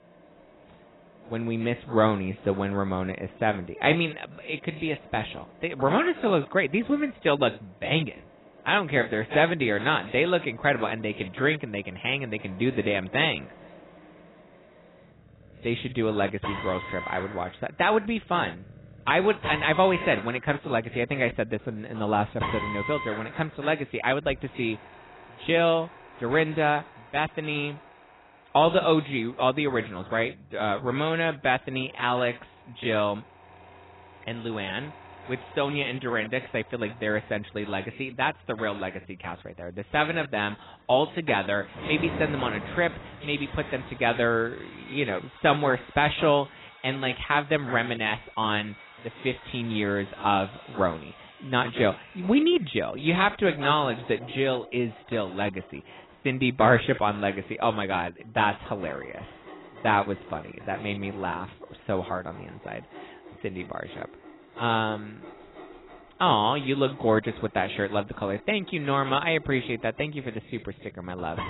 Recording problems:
garbled, watery; badly; nothing above 4 kHz
machinery noise; noticeable; throughout; 20 dB below the speech

